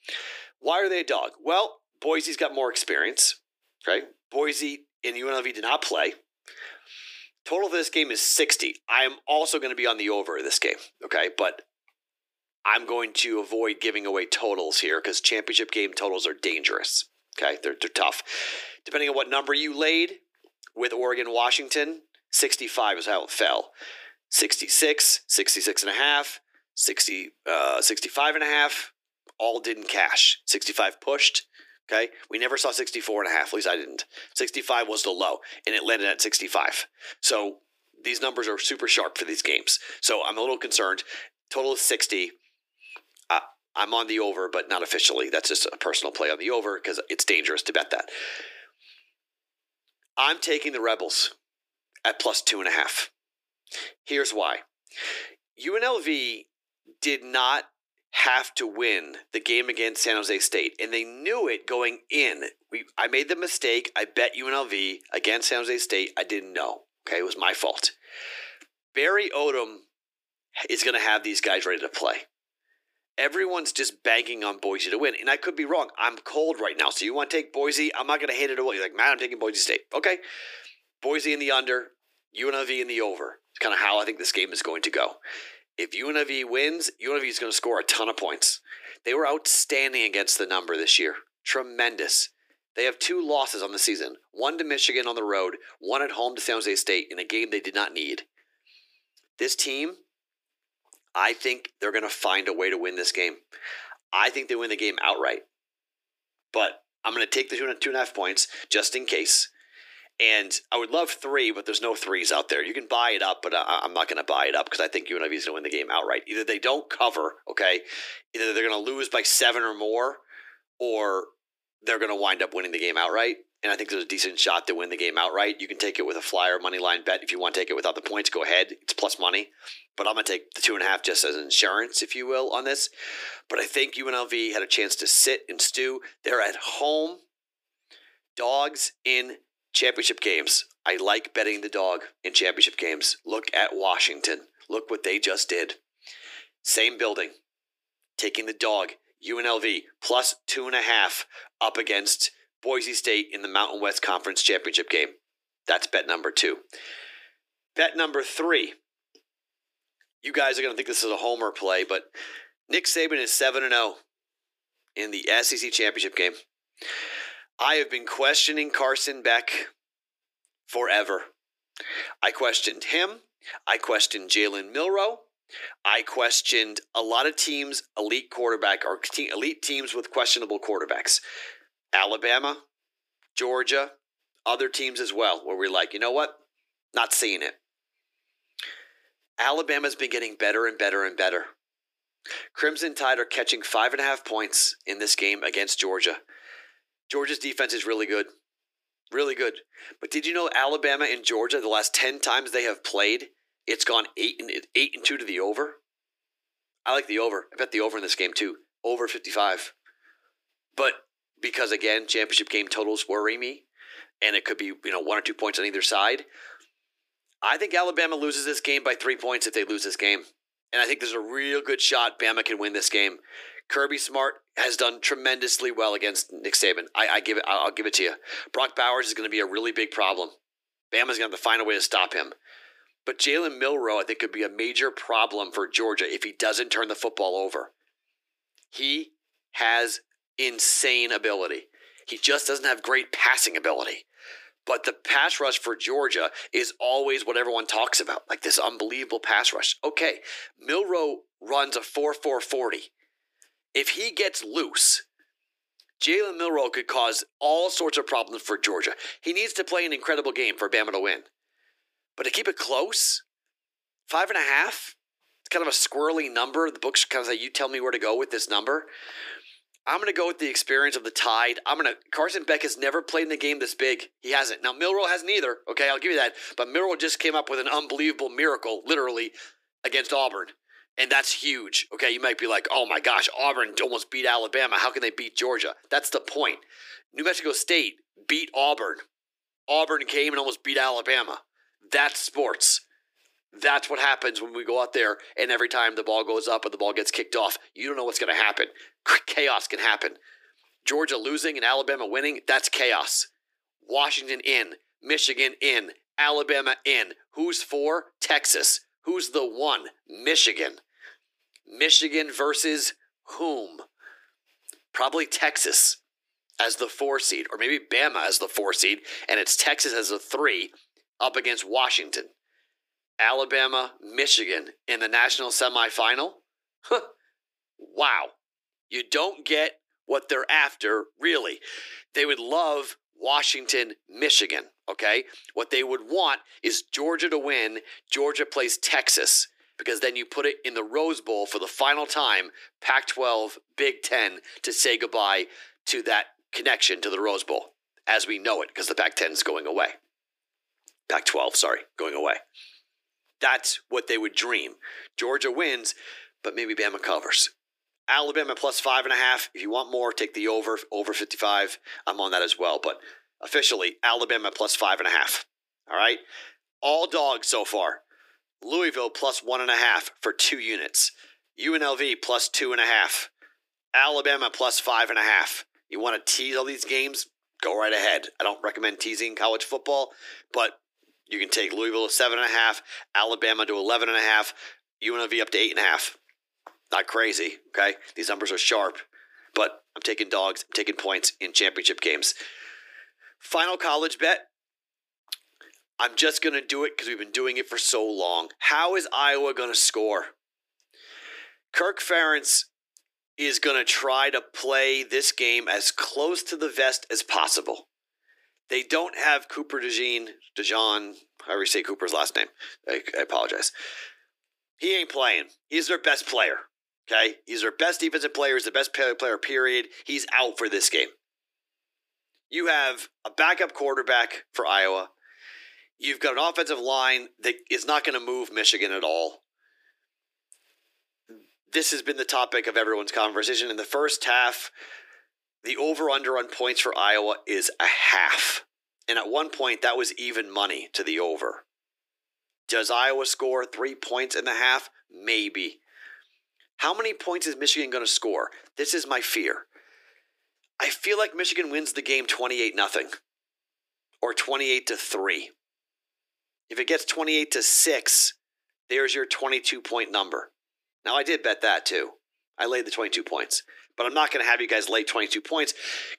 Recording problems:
thin; very; fading below 300 Hz

